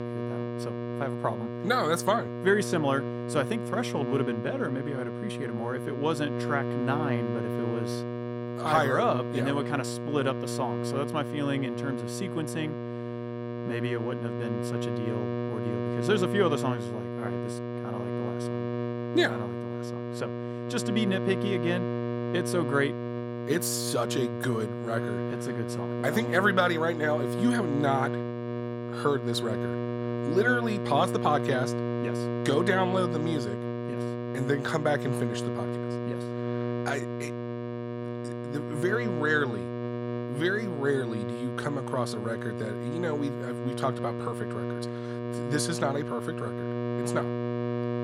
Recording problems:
electrical hum; loud; throughout; 60 Hz, 6 dB below the speech

